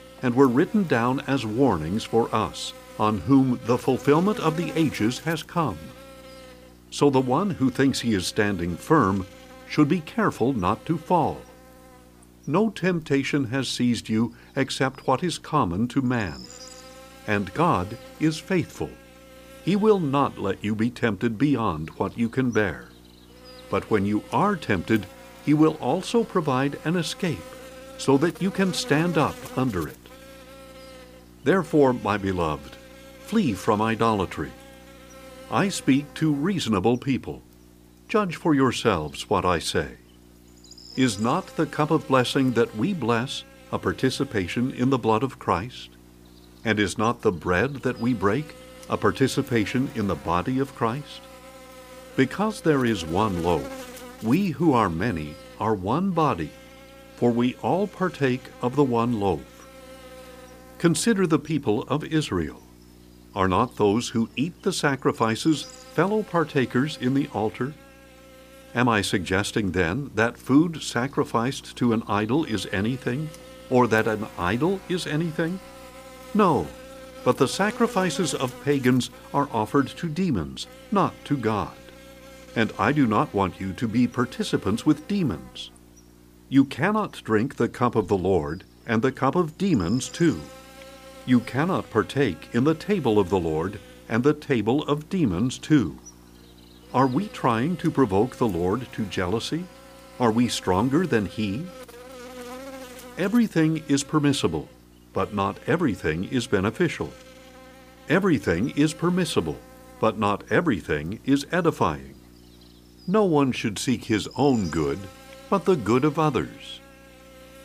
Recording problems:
electrical hum; noticeable; throughout; 60 Hz, 20 dB below the speech

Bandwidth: 15 kHz